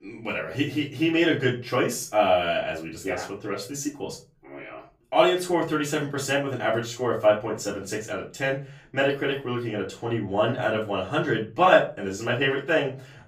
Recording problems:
off-mic speech; far
room echo; slight; dies away in 0.3 s

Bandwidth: 15.5 kHz